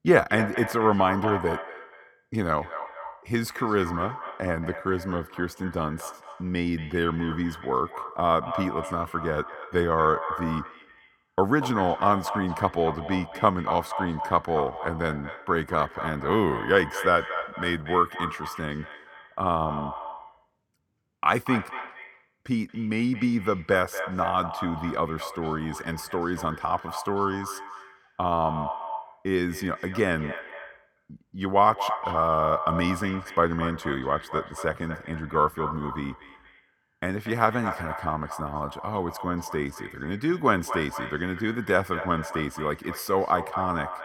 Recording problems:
echo of what is said; strong; throughout; 230 ms later, 9 dB below the speech

